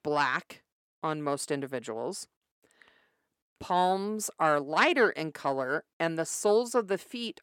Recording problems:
none

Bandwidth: 17 kHz